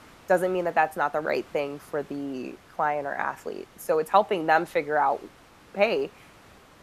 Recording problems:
hiss; faint; throughout; 25 dB below the speech

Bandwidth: 14.5 kHz